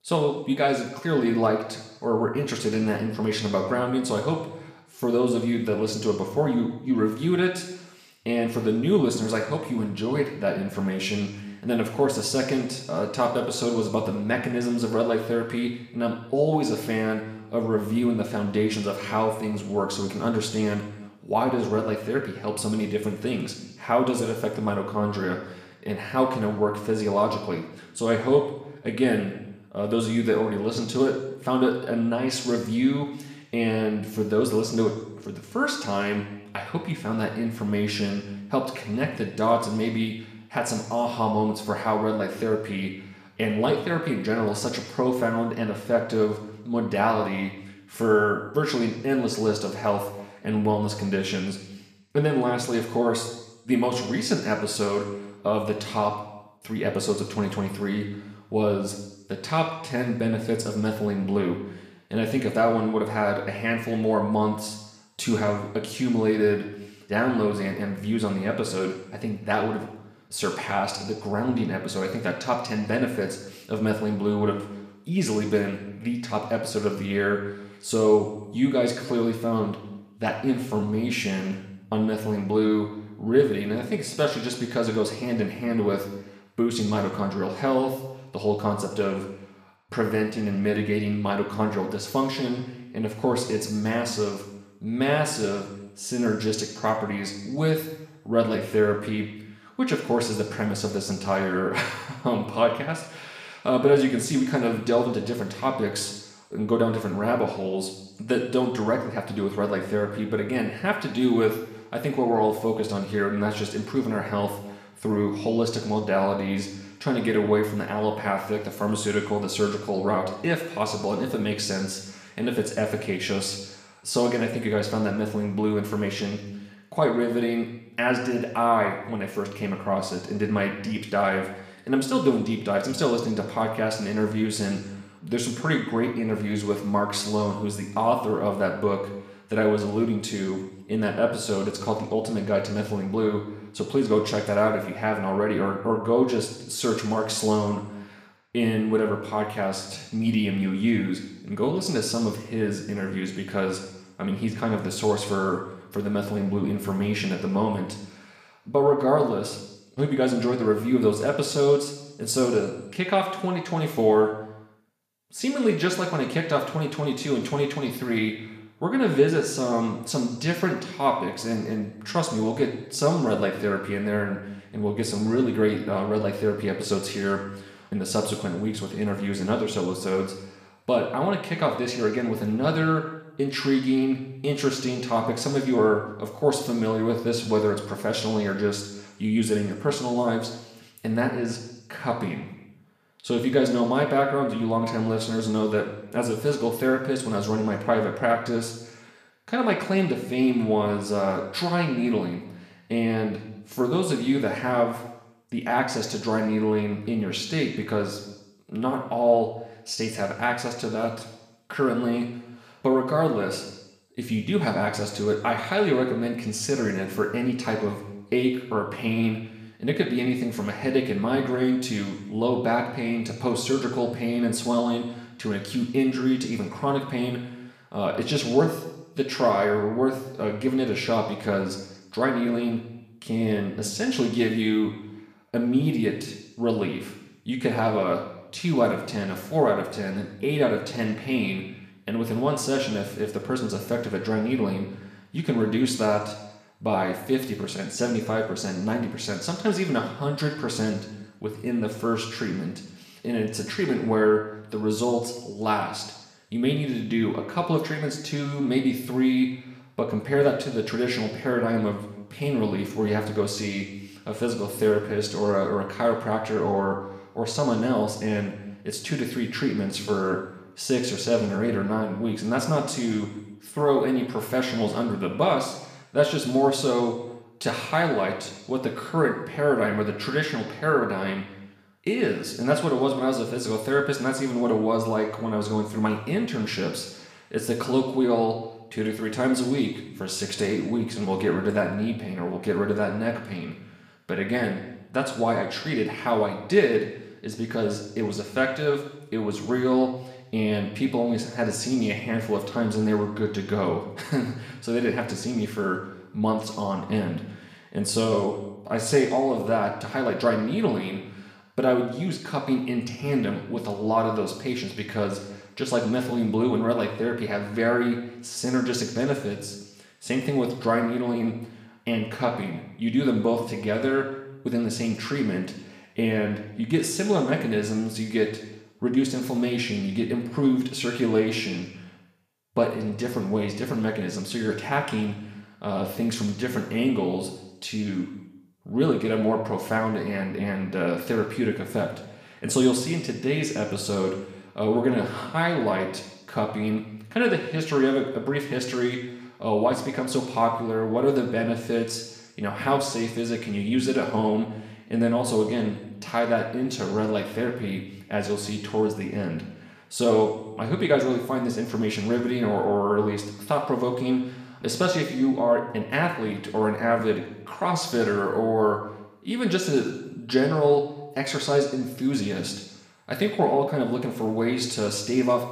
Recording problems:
room echo; slight; dies away in 0.9 s
off-mic speech; somewhat distant

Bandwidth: 15 kHz